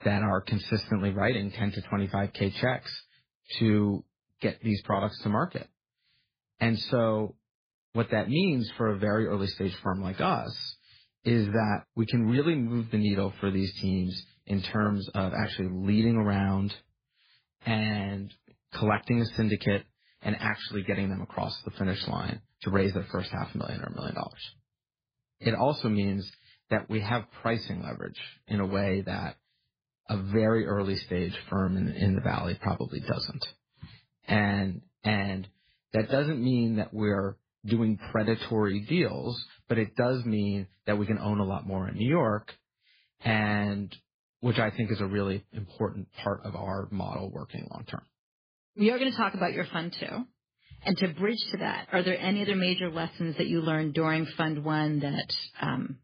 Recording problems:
garbled, watery; badly

